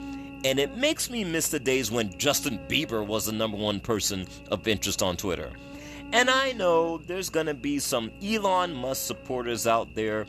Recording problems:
electrical hum; noticeable; throughout; 60 Hz, 20 dB below the speech

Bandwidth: 13.5 kHz